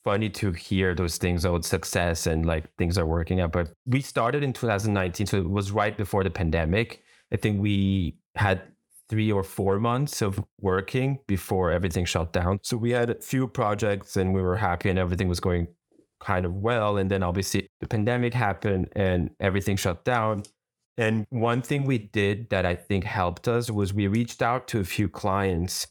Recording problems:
none

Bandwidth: 18 kHz